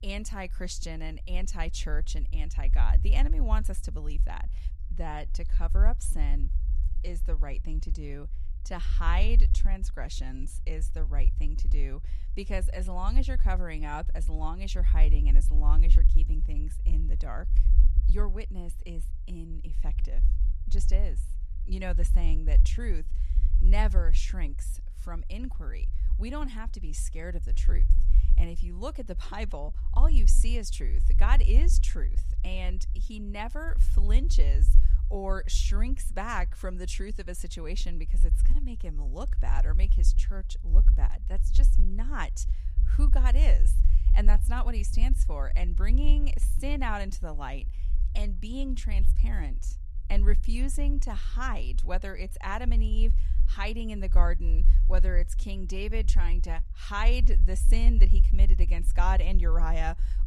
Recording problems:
low rumble; noticeable; throughout; 15 dB below the speech

